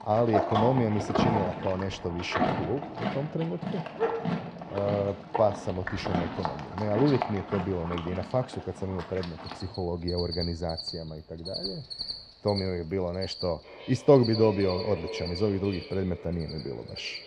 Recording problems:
echo of what is said; strong; from 14 s on; 250 ms later, 10 dB below the speech
muffled; very; fading above 3 kHz
animal sounds; loud; throughout; 4 dB below the speech

